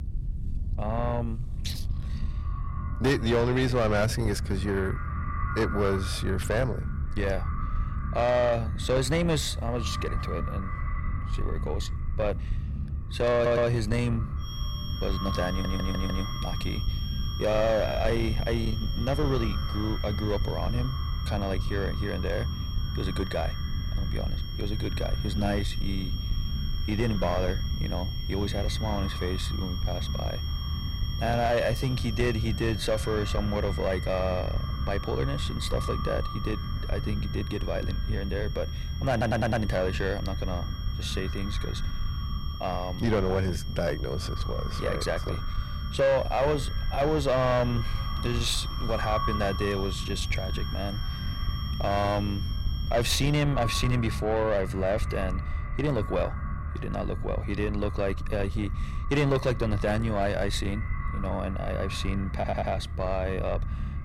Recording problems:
echo of what is said; noticeable; throughout; 490 ms later, 15 dB below the speech
distortion; slight; 10 dB below the speech
high-pitched whine; noticeable; from 14 to 53 s; 3 kHz, 10 dB below the speech
low rumble; noticeable; throughout; 15 dB below the speech
audio stuttering; 4 times, first at 13 s

